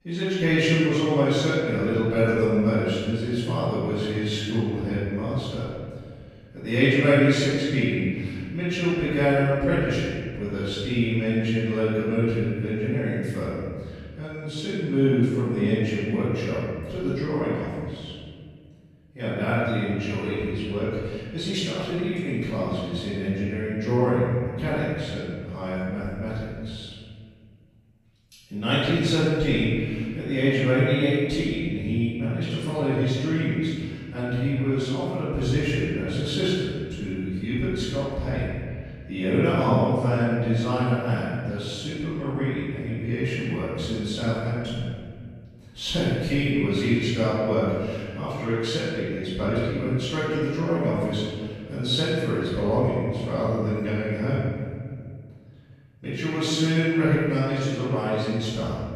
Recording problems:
room echo; strong; dies away in 1.9 s
off-mic speech; far

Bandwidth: 14.5 kHz